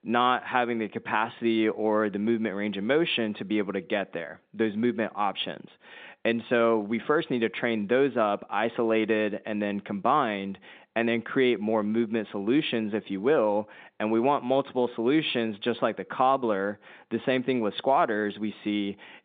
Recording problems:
phone-call audio; nothing above 3.5 kHz

